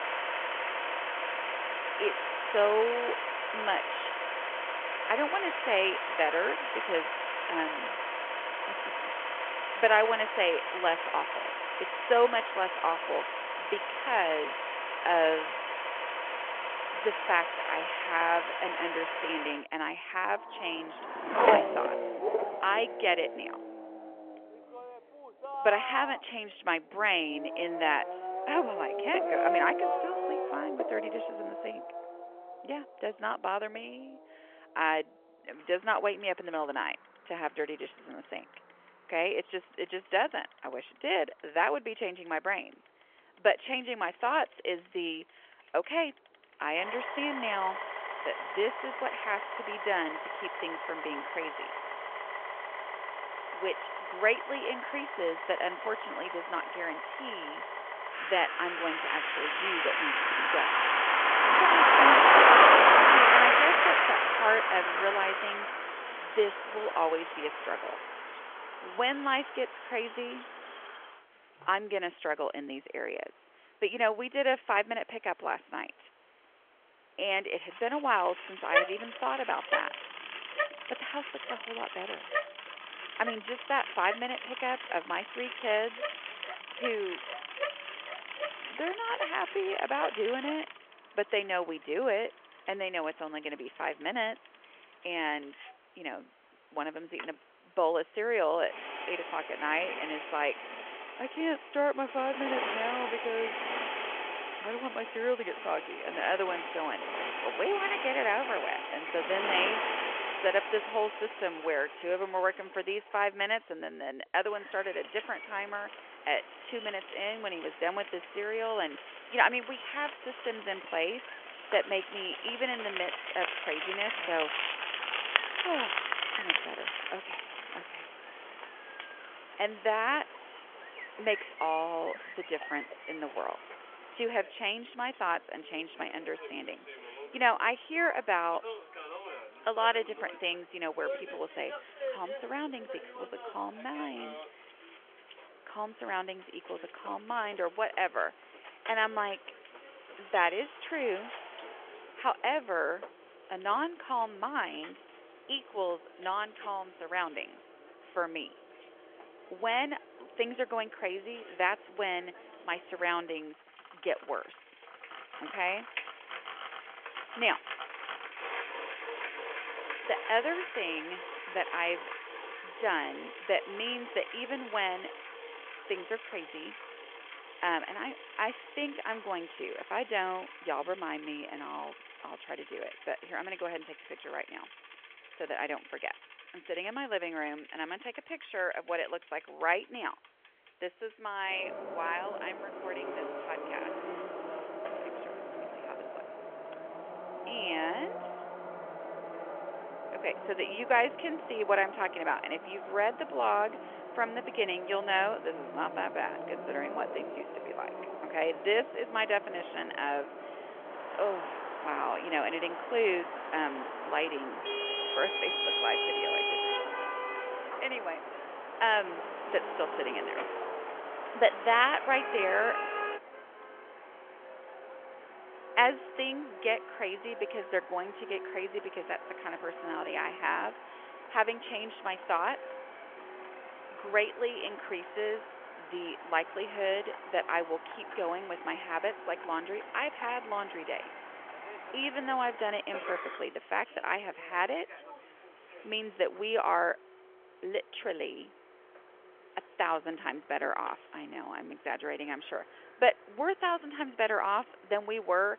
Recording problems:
phone-call audio; nothing above 3 kHz
traffic noise; very loud; throughout; 1 dB above the speech

